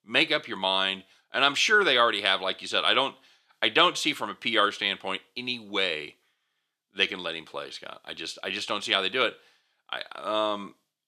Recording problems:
thin; somewhat; fading below 350 Hz

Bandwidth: 14.5 kHz